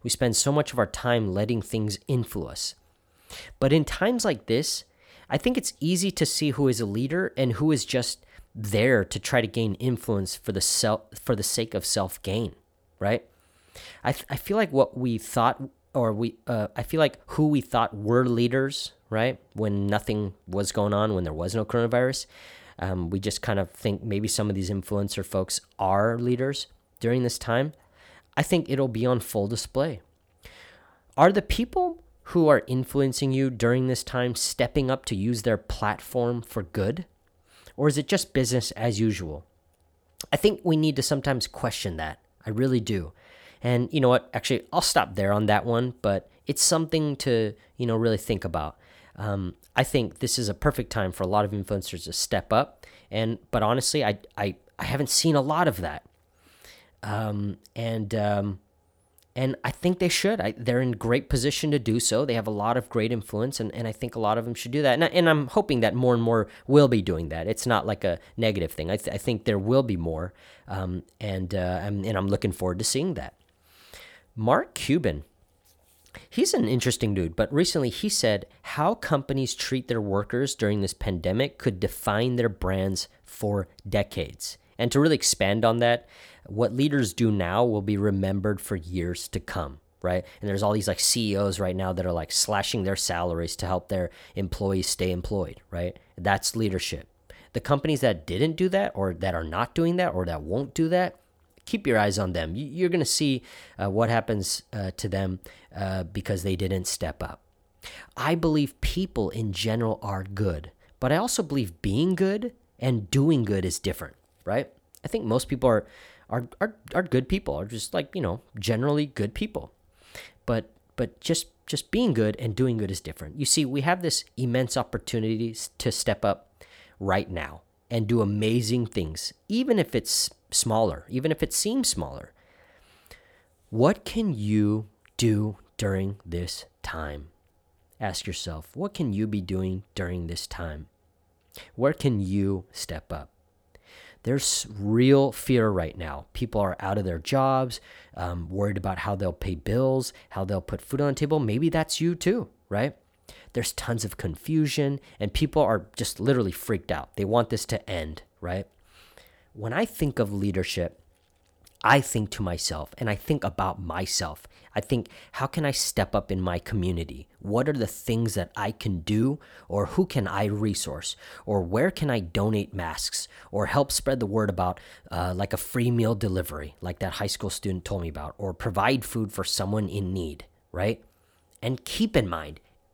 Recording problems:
none

